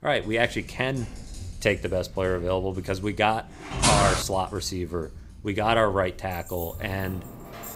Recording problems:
household noises; noticeable; throughout; 15 dB below the speech
footsteps; loud; at 4 s; peak 5 dB above the speech
jangling keys; faint; from 6.5 s on; peak 10 dB below the speech

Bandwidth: 15.5 kHz